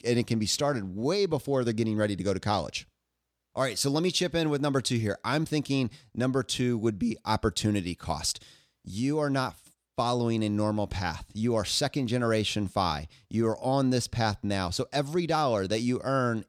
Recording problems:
none

